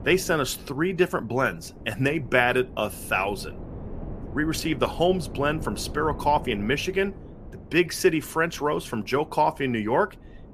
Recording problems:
wind noise on the microphone; occasional gusts; 20 dB below the speech

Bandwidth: 14.5 kHz